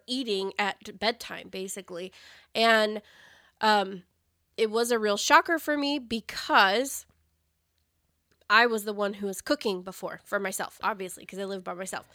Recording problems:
none

